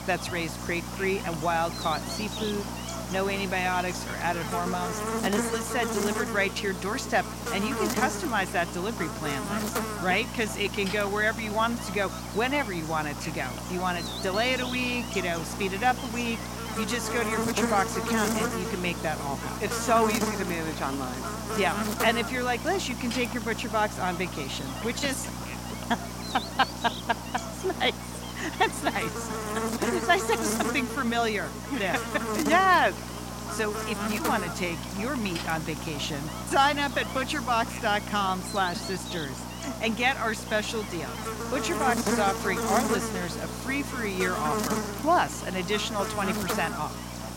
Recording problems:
electrical hum; loud; throughout; 60 Hz, 6 dB below the speech

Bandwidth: 16 kHz